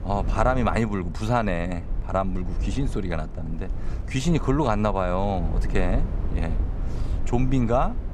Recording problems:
low rumble; noticeable; throughout; 15 dB below the speech

